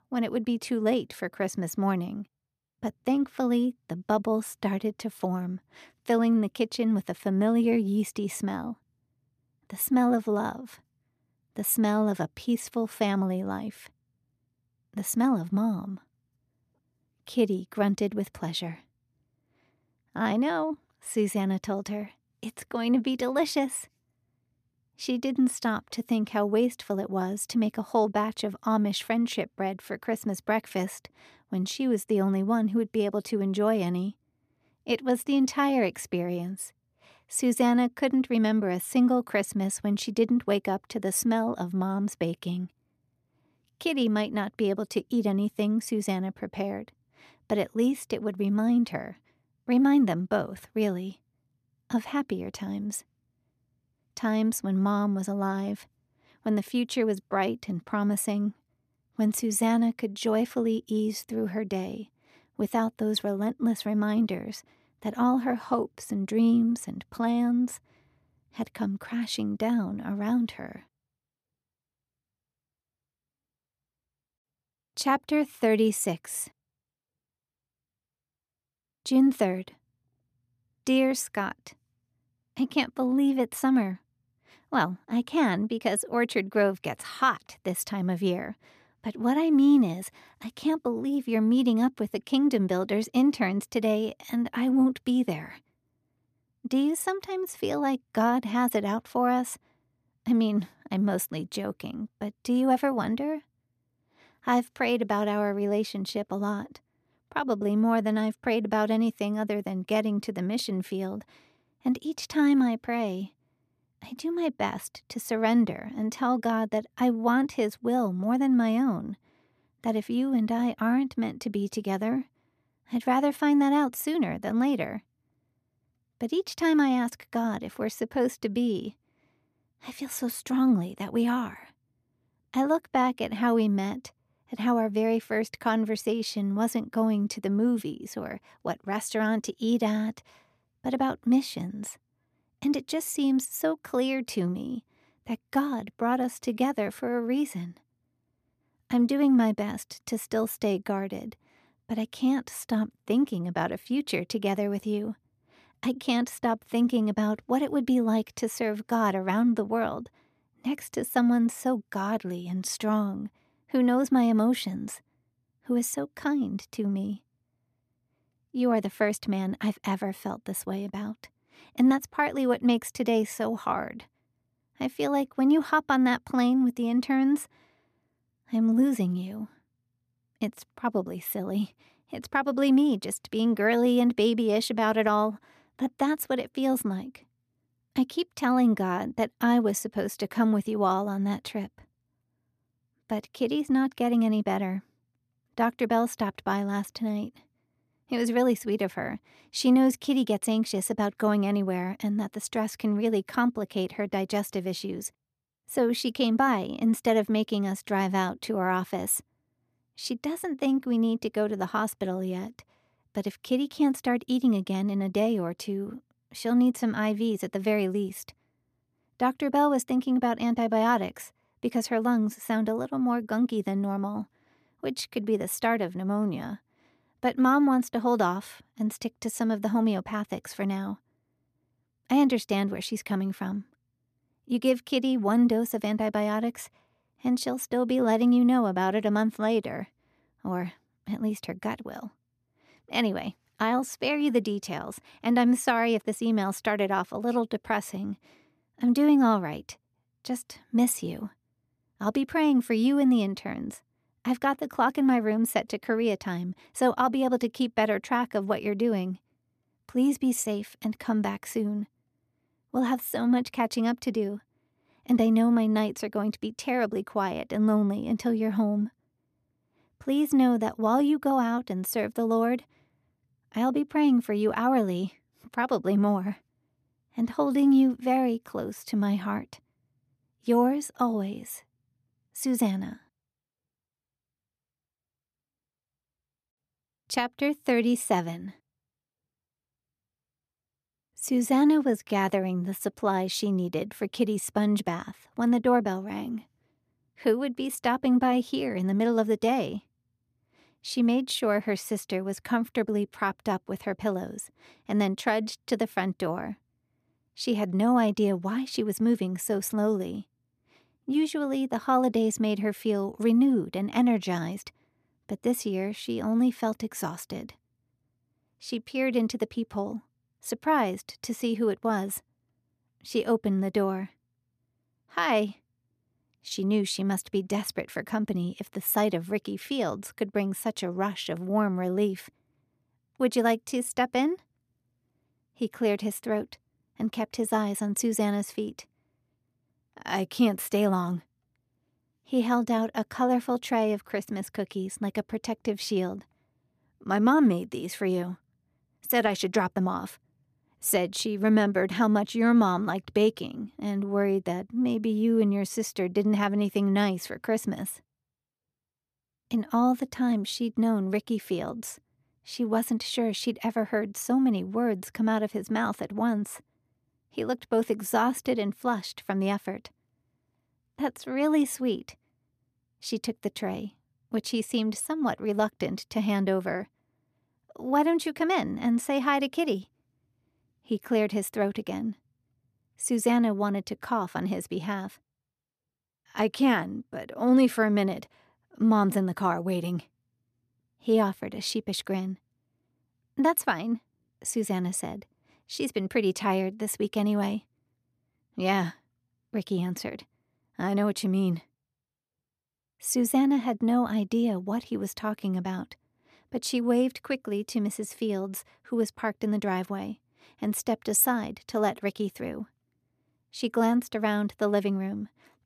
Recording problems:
none

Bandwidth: 14.5 kHz